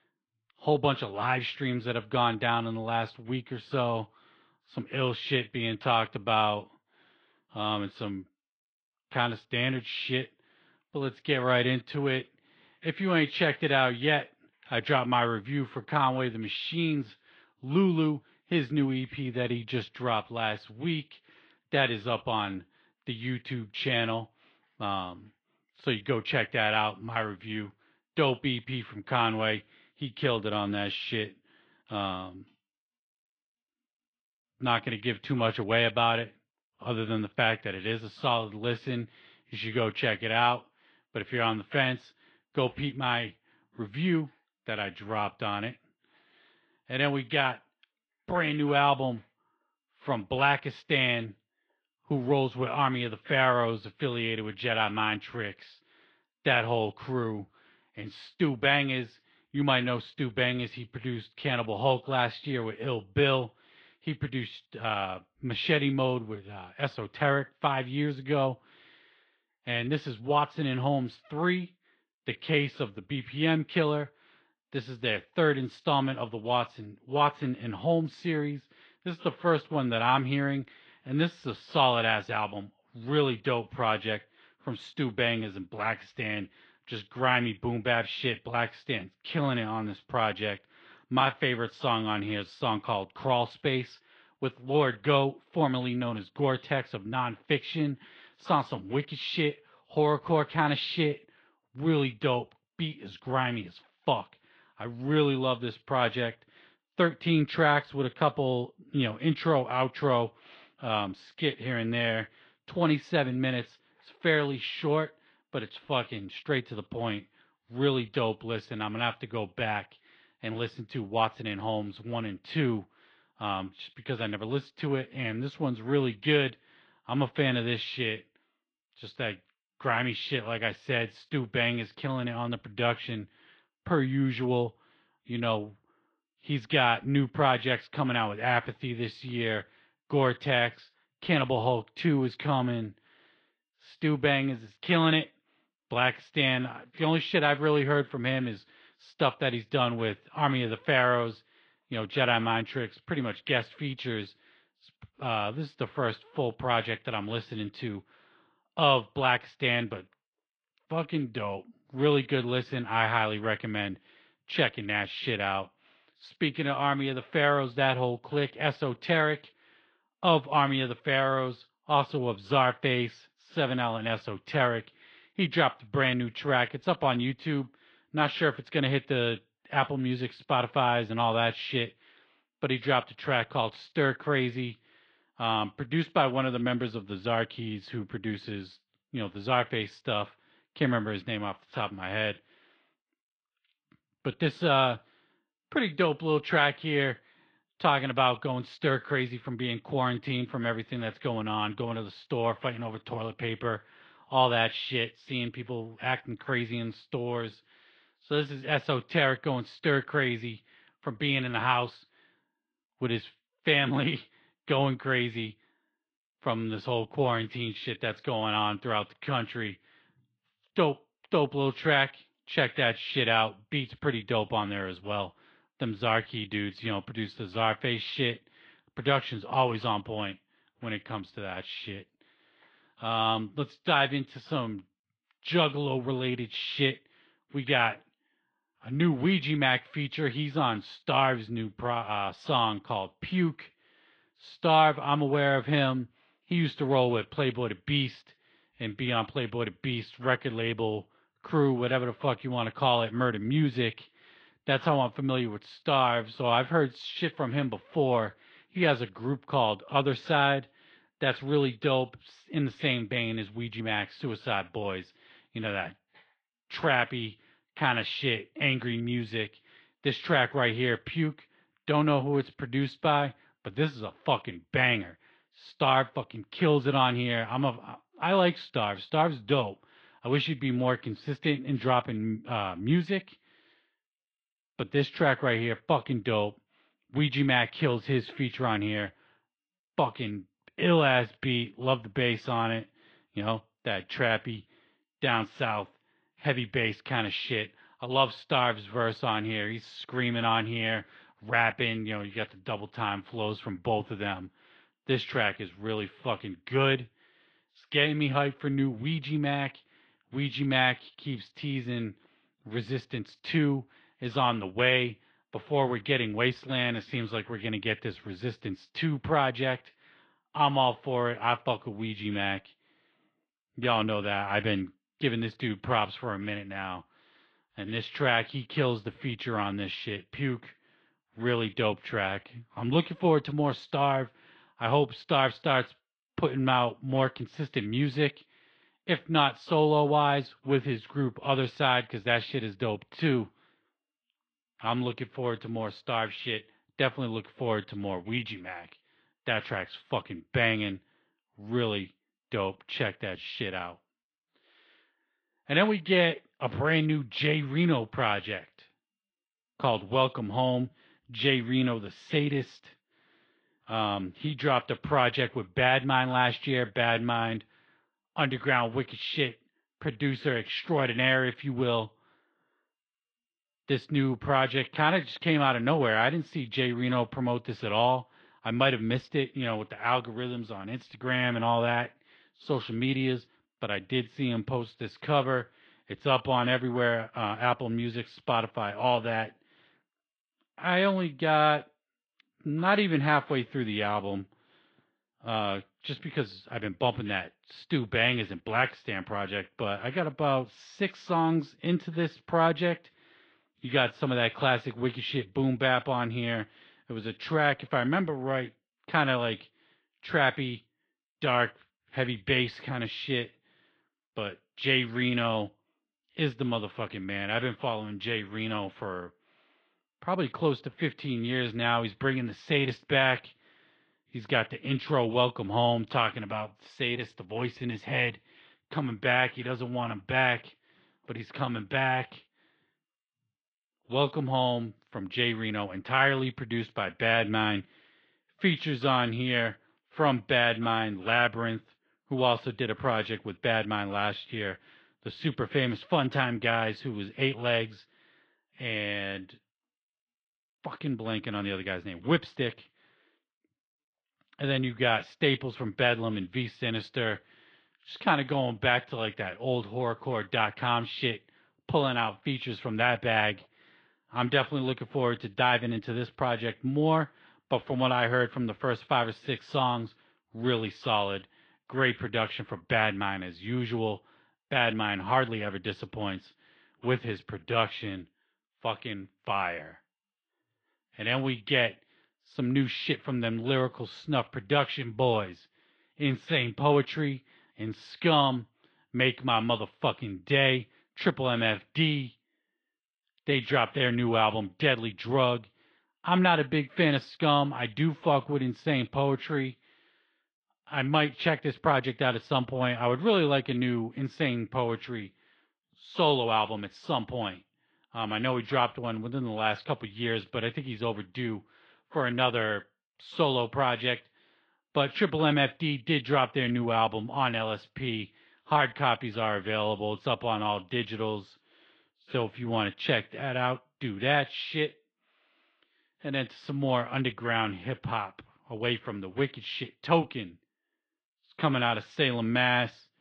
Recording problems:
muffled; slightly; fading above 3.5 kHz
garbled, watery; slightly

